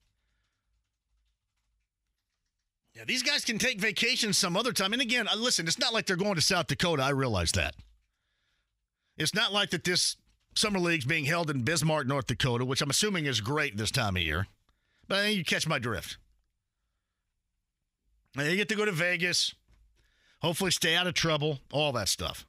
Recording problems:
none

